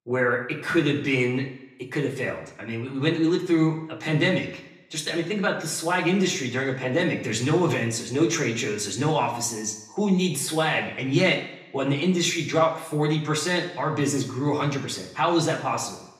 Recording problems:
off-mic speech; far
room echo; slight; dies away in 0.7 s

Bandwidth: 15.5 kHz